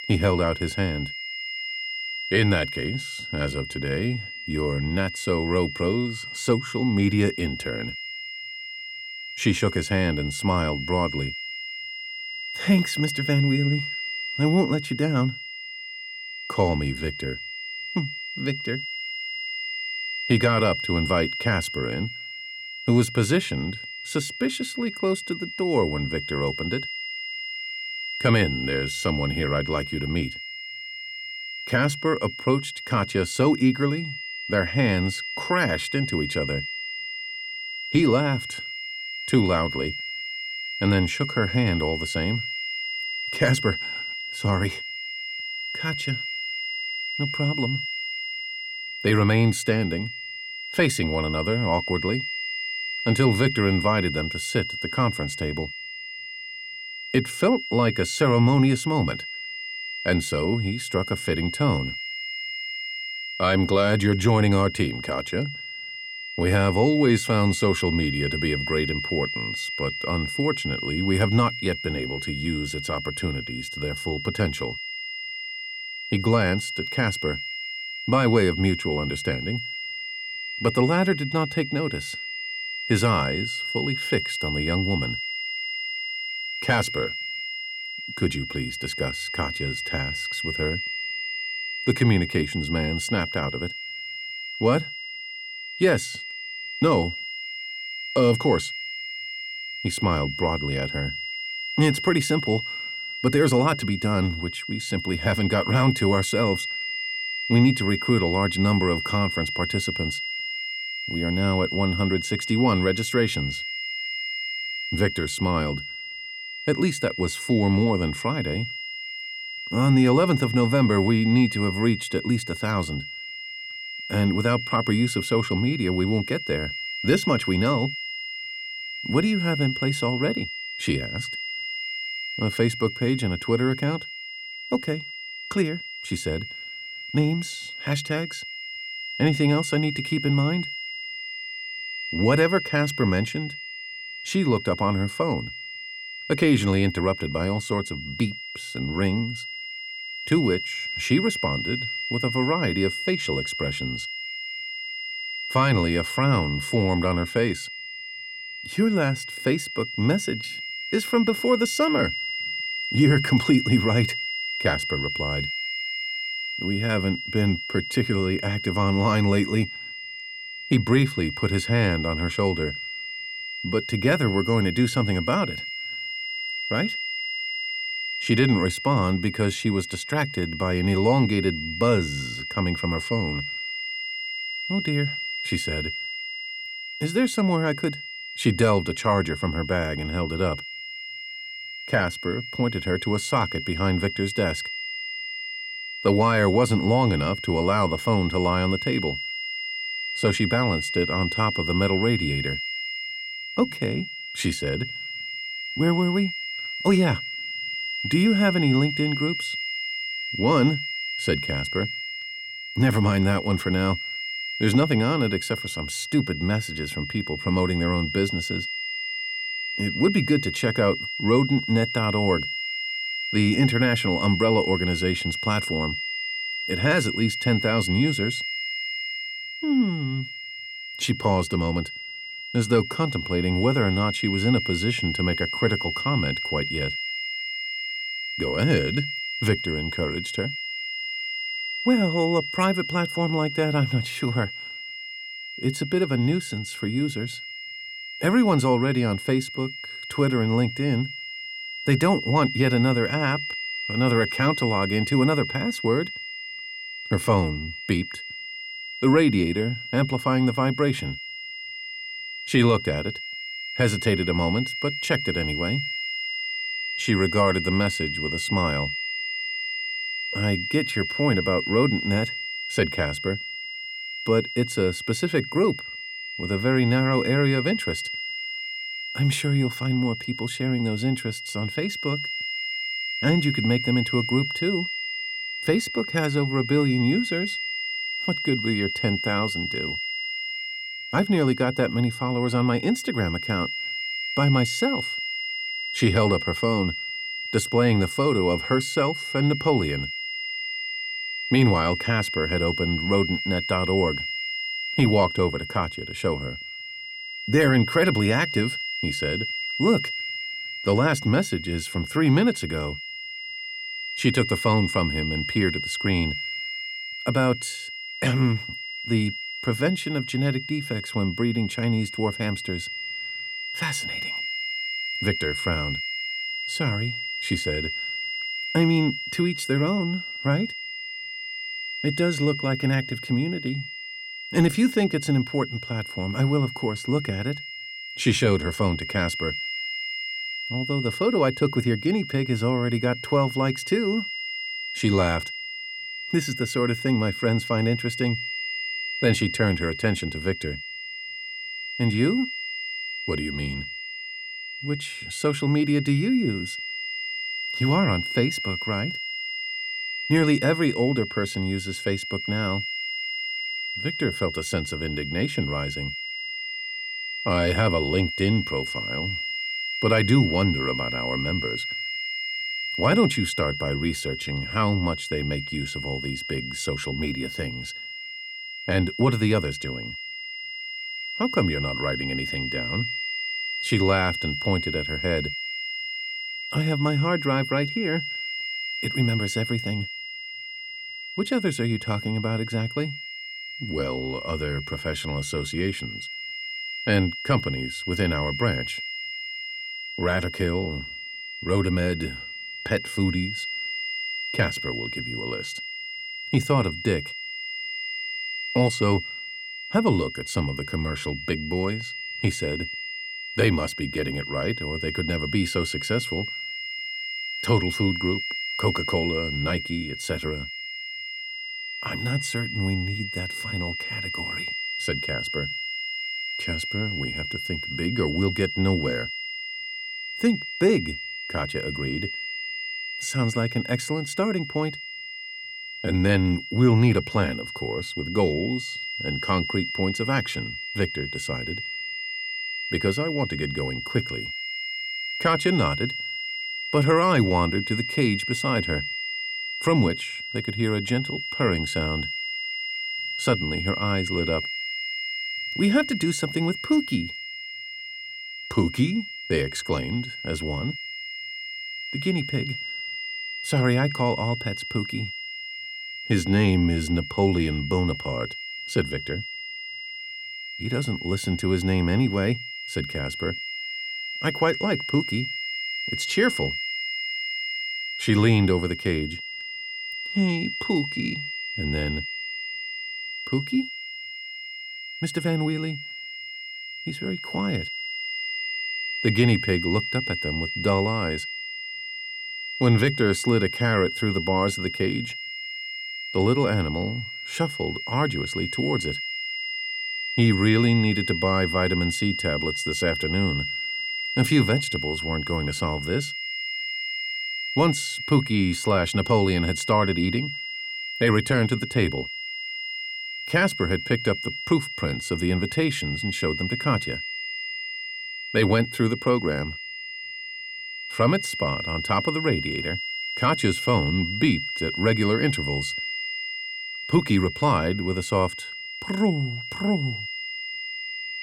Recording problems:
high-pitched whine; loud; throughout; 2 kHz, 5 dB below the speech

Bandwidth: 16.5 kHz